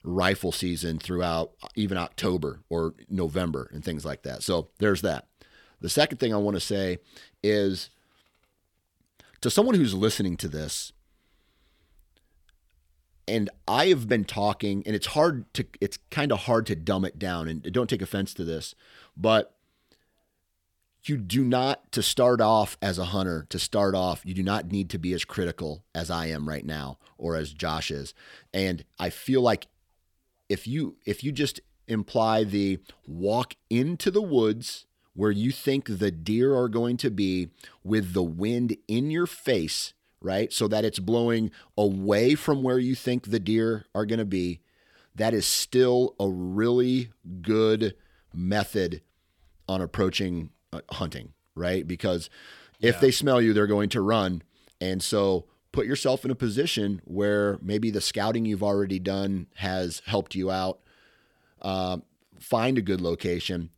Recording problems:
none

